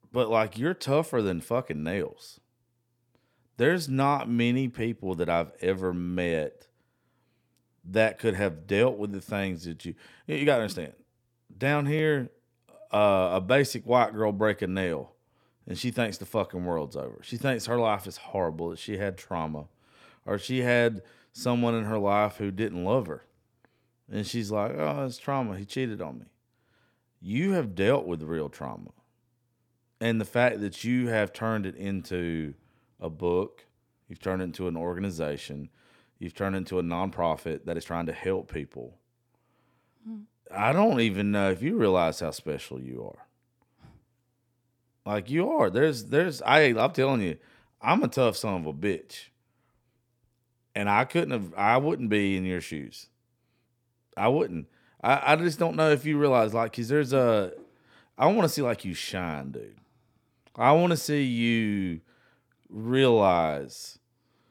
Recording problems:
uneven, jittery; strongly; from 10 to 41 s

